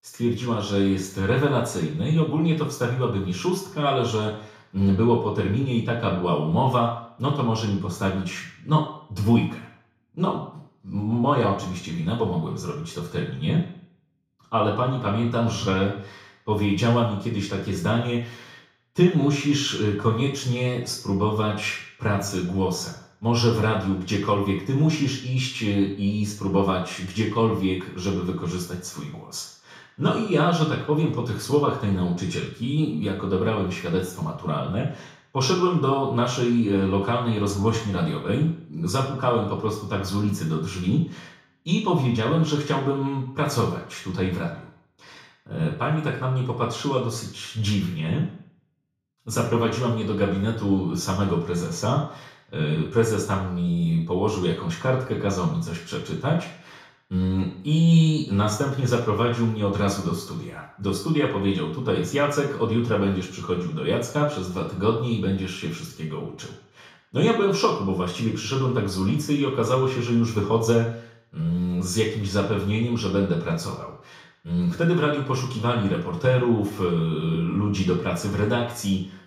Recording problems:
off-mic speech; far
room echo; noticeable; dies away in 0.6 s

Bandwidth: 15.5 kHz